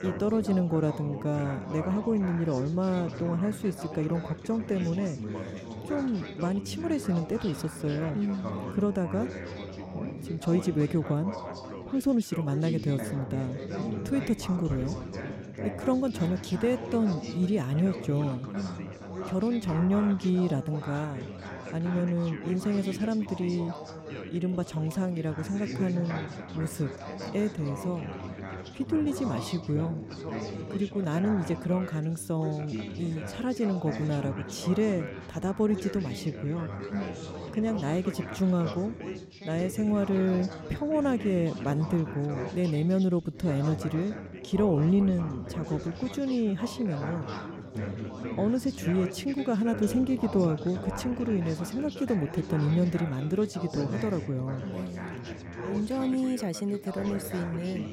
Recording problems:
background chatter; loud; throughout; 4 voices, 9 dB below the speech

